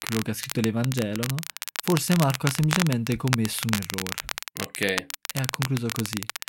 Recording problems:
crackle, like an old record; loud; 4 dB below the speech

